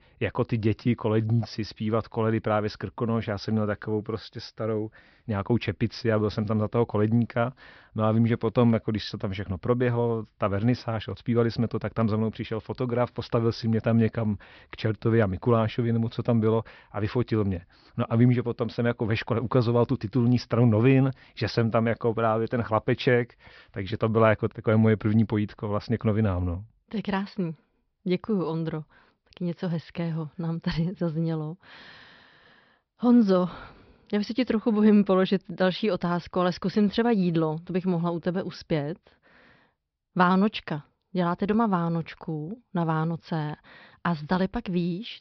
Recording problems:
high frequencies cut off; noticeable; nothing above 5.5 kHz

